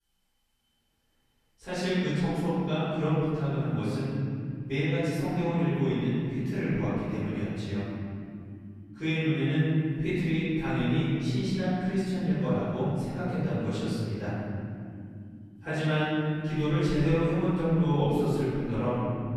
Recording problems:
room echo; strong; dies away in 3 s
off-mic speech; far

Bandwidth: 14 kHz